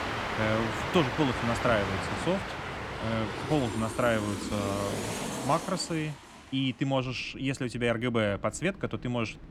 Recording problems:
train or aircraft noise; loud; throughout; 3 dB below the speech

